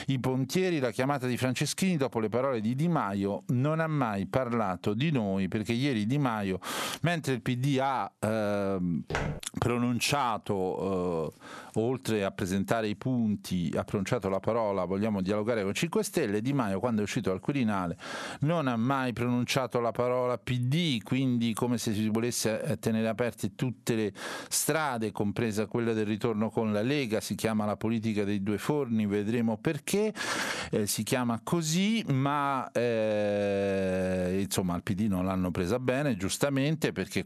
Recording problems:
squashed, flat; heavily
footsteps; noticeable; at 9 s; peak 4 dB below the speech

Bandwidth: 13.5 kHz